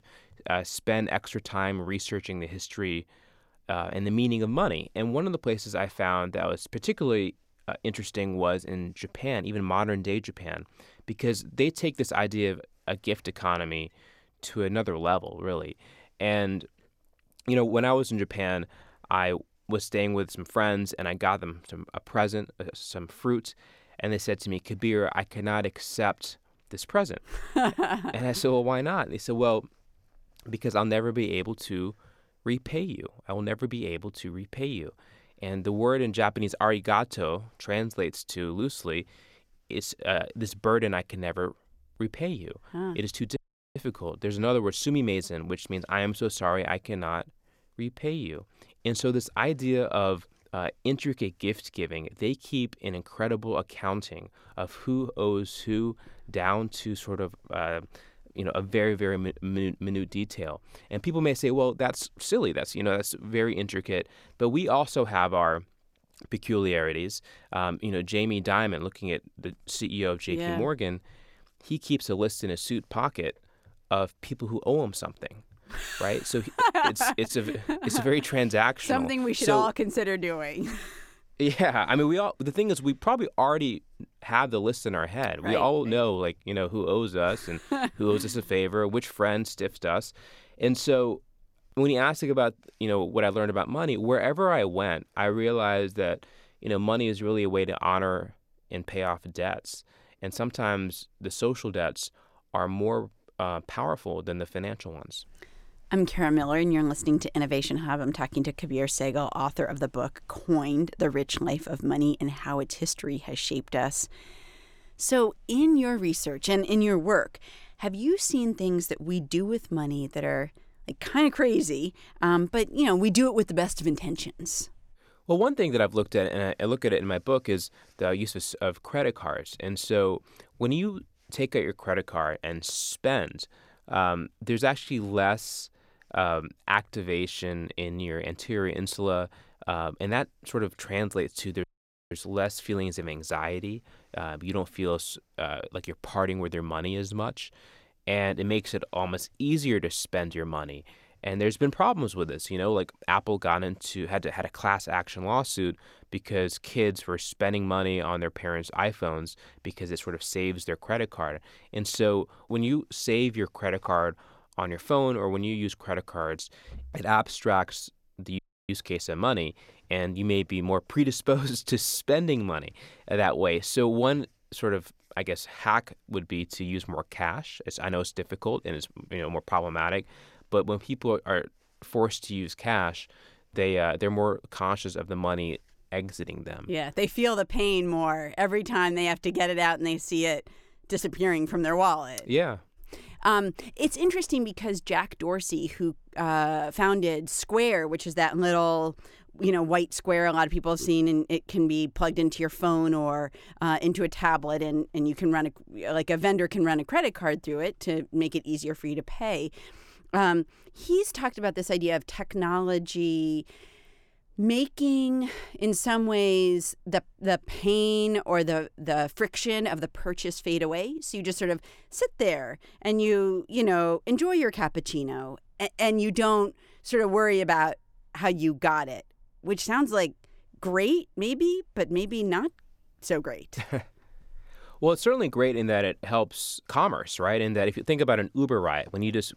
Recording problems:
audio cutting out; at 43 s, at 2:22 and at 2:48

